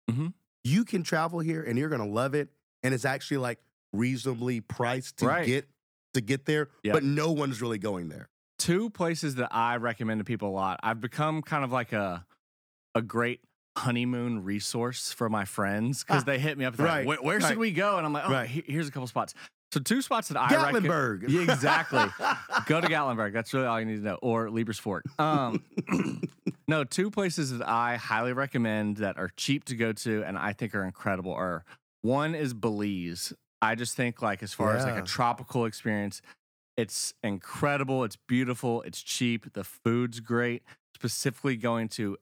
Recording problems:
none

